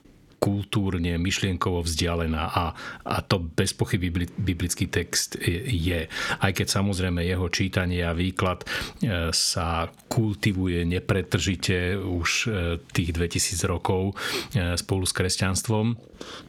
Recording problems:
squashed, flat; somewhat

